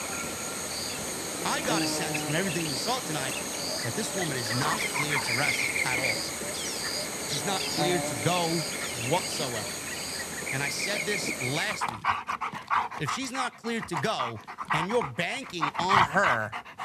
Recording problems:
animal sounds; very loud; throughout; 2 dB above the speech

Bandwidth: 13.5 kHz